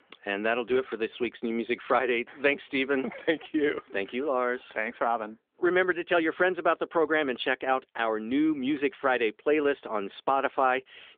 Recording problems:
phone-call audio

